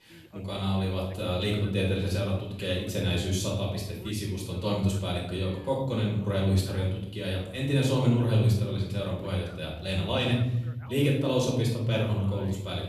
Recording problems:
off-mic speech; far
room echo; noticeable; dies away in 1.3 s
voice in the background; faint; throughout; 25 dB below the speech

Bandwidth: 13.5 kHz